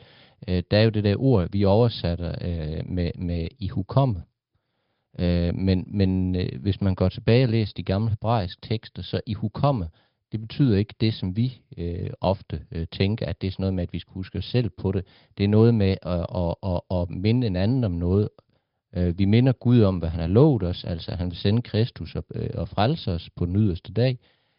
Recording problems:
high frequencies cut off; noticeable; nothing above 5 kHz
garbled, watery; slightly

